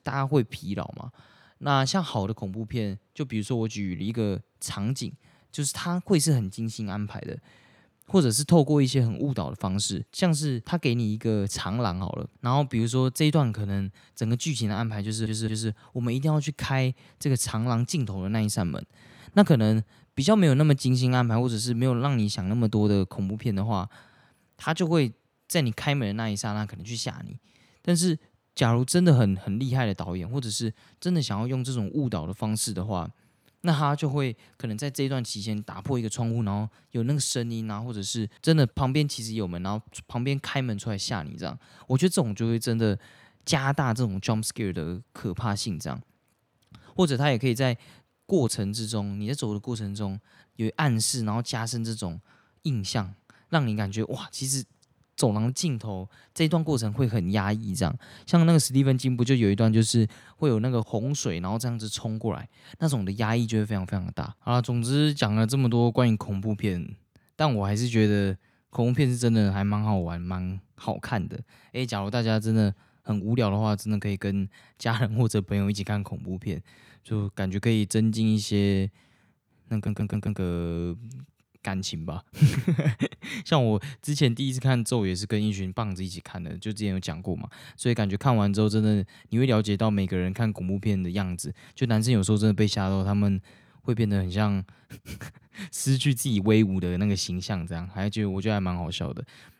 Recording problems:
audio stuttering; at 15 s and at 1:20

